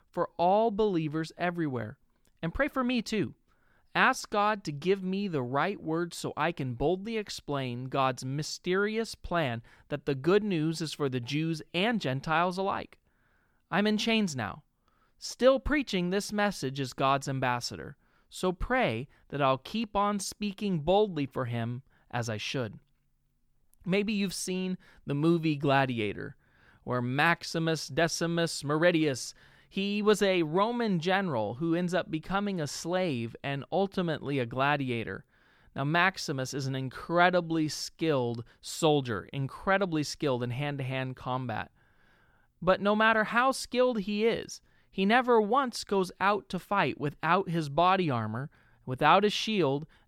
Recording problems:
none

